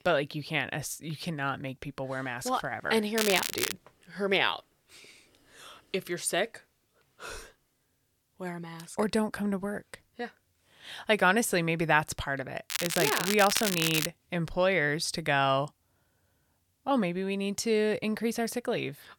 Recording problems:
crackling; loud; at 3 s and from 13 to 14 s; 1 dB below the speech

